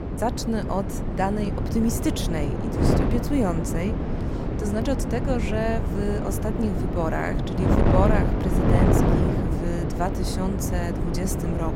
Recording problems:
wind noise on the microphone; heavy; 1 dB below the speech

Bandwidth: 16 kHz